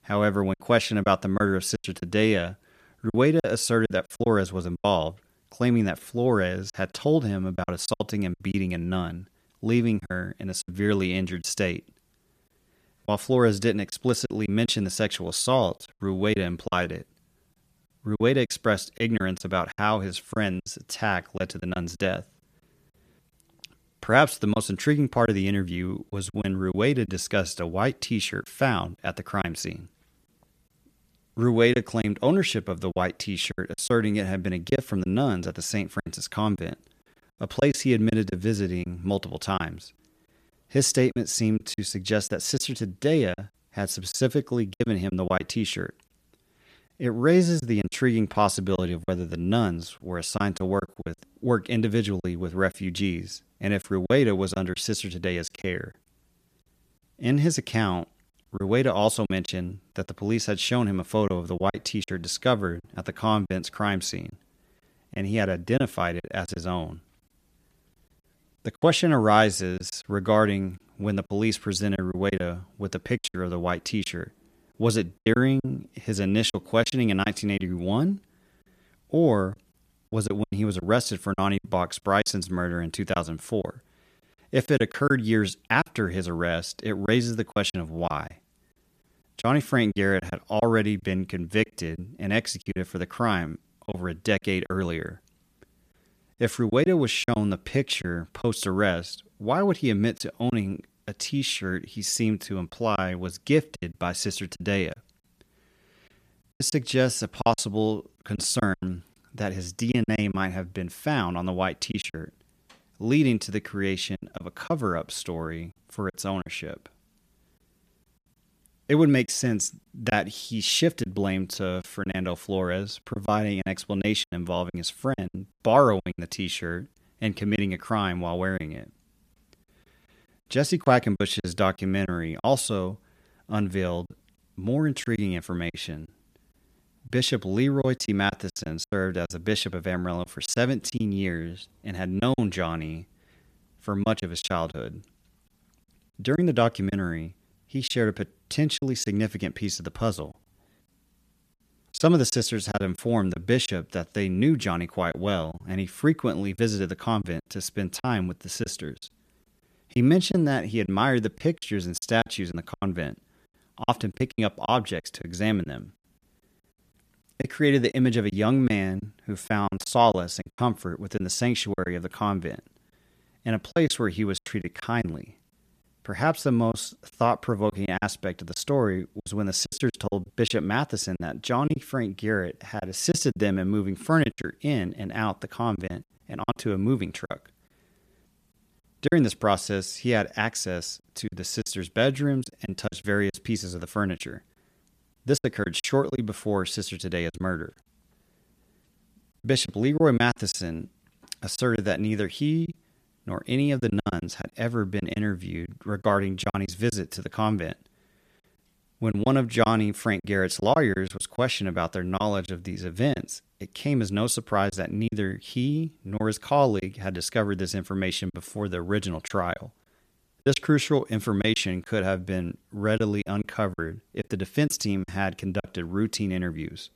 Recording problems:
choppy; very; 7% of the speech affected

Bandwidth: 14.5 kHz